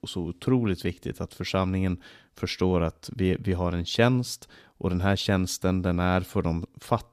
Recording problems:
none

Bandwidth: 14.5 kHz